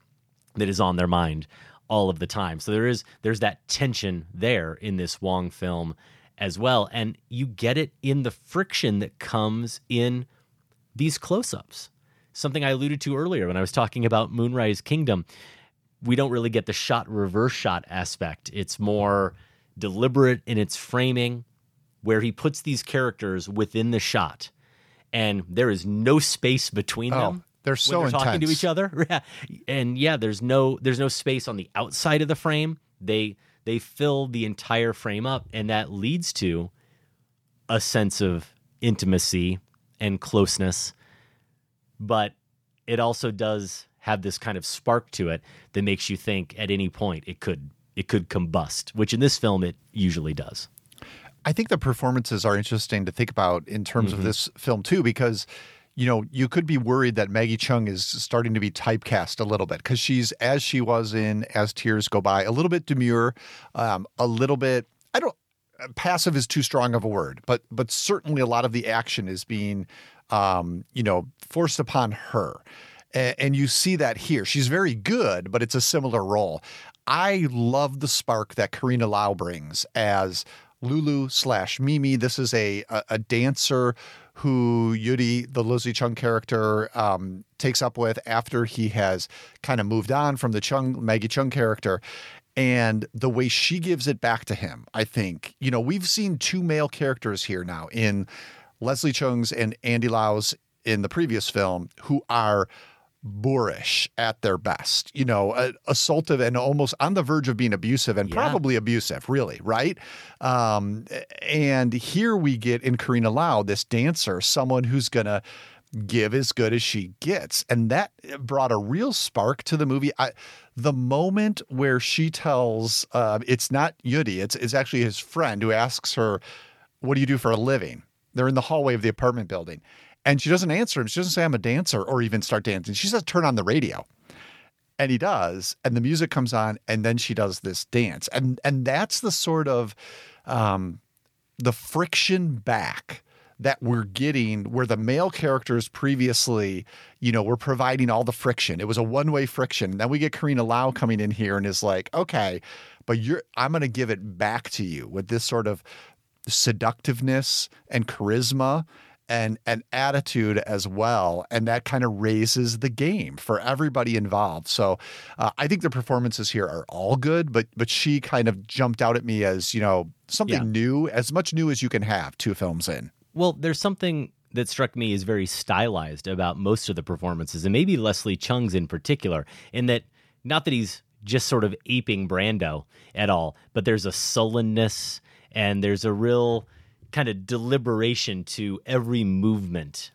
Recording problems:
none

